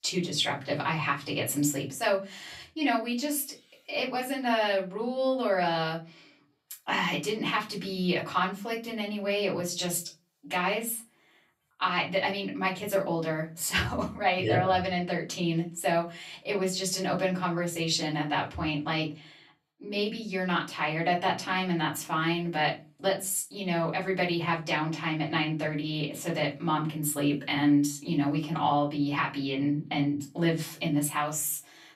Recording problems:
off-mic speech; far
room echo; very slight; dies away in 0.2 s

